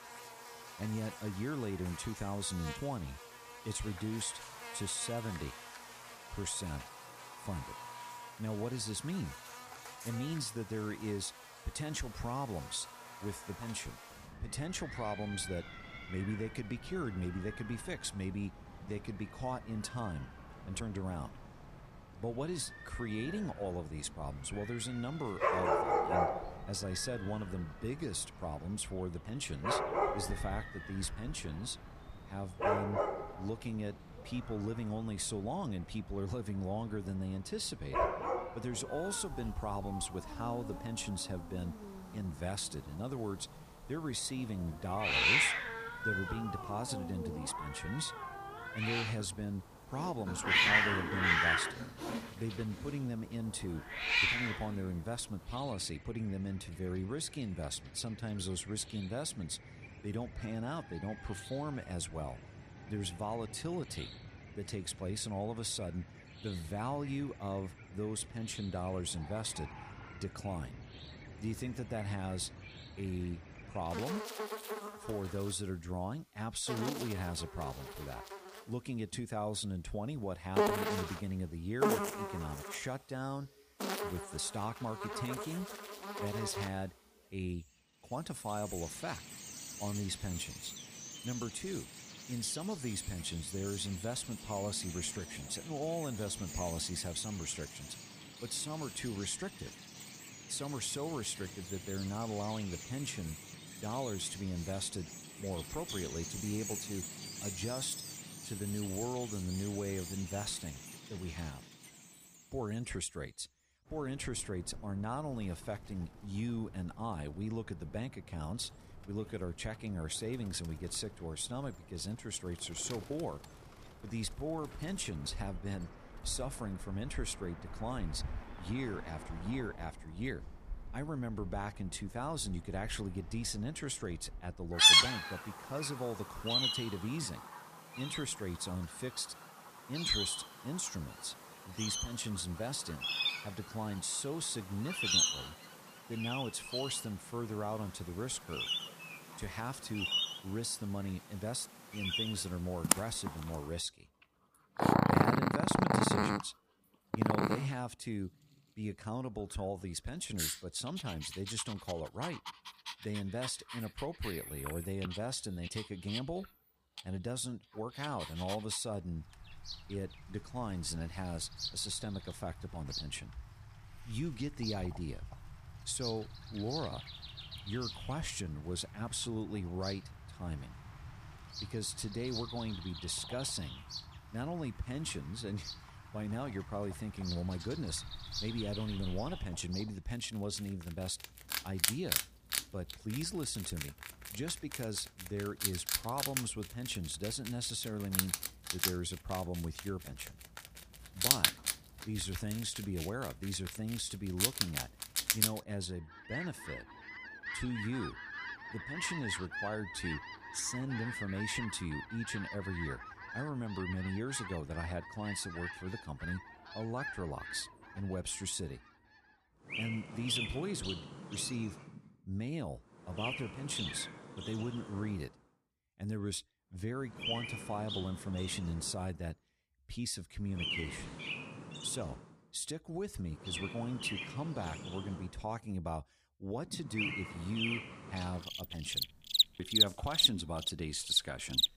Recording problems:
animal sounds; very loud; throughout; 3 dB above the speech

